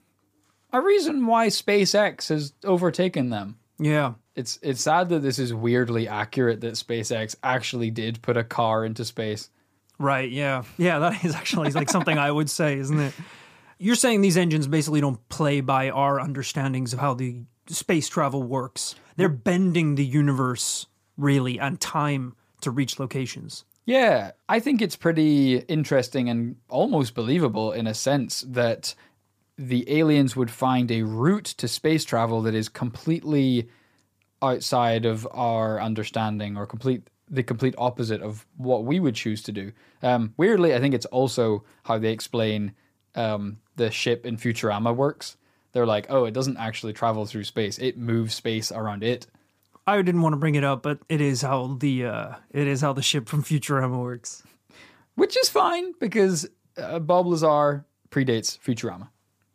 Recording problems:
none

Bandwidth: 15 kHz